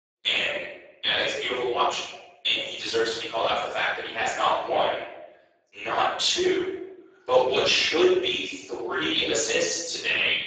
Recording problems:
off-mic speech; far
garbled, watery; badly; nothing above 7.5 kHz
thin; very; fading below 350 Hz
room echo; noticeable; dies away in 0.7 s

